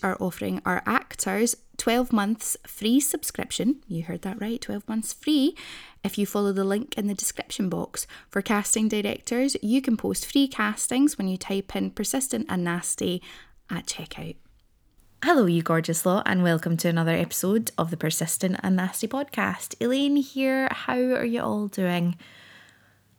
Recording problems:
none

